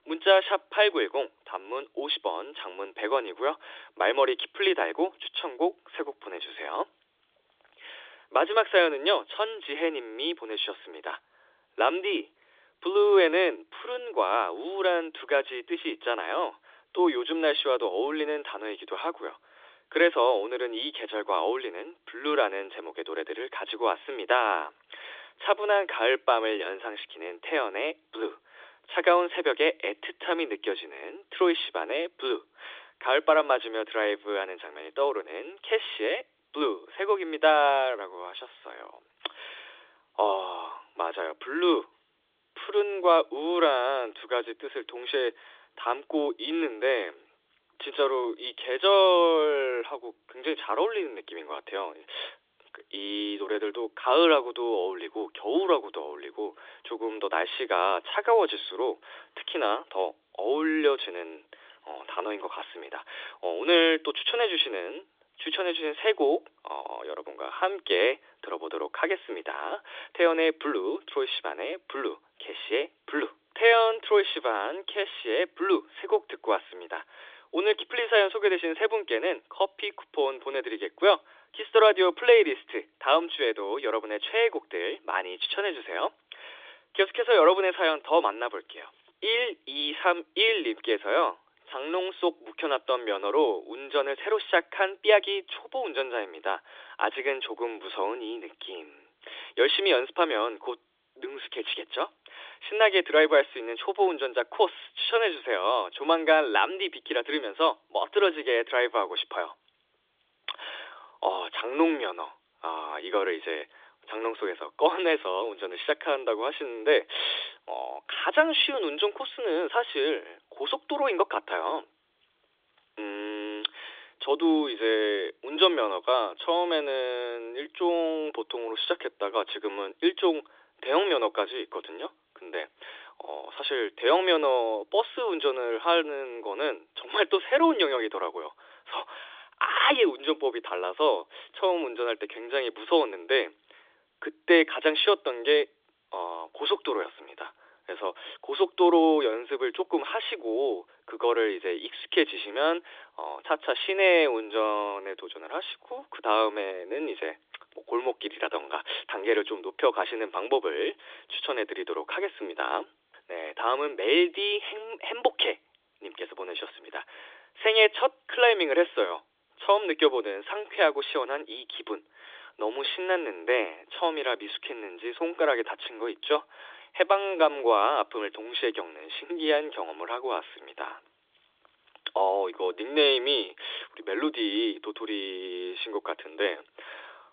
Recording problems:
thin; very; fading below 300 Hz
phone-call audio; nothing above 3.5 kHz

